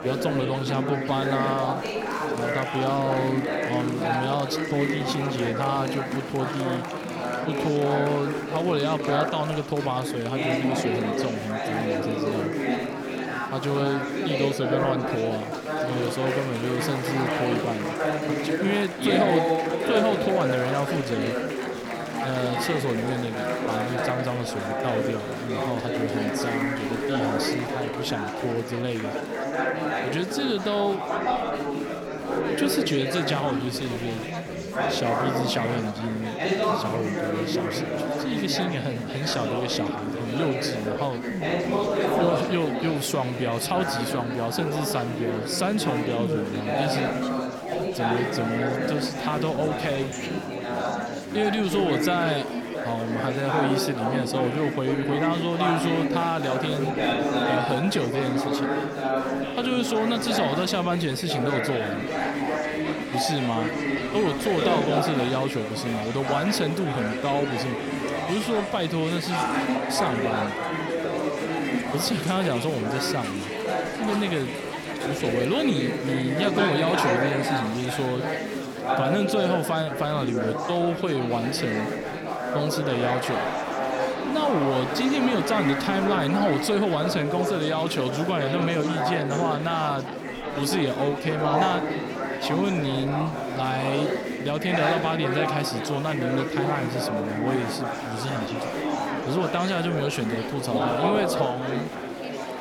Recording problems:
chatter from many people; very loud; throughout; as loud as the speech

